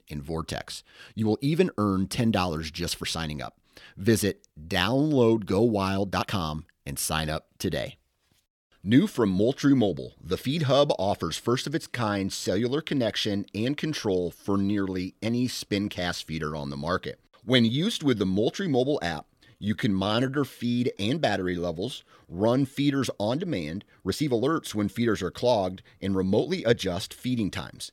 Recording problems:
uneven, jittery; strongly; from 1 to 27 s

